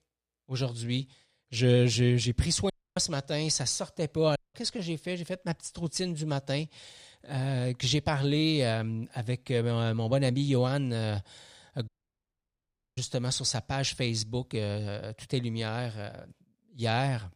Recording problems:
audio cutting out; at 2.5 s, at 4.5 s and at 12 s for 1 s

